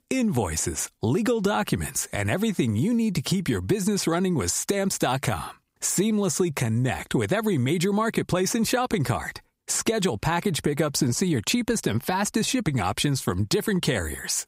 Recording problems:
squashed, flat; somewhat

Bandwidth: 15.5 kHz